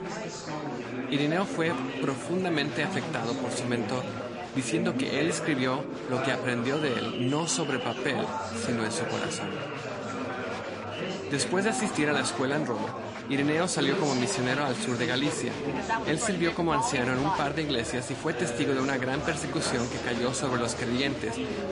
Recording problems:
garbled, watery; slightly; nothing above 10.5 kHz
chatter from many people; loud; throughout; 4 dB below the speech

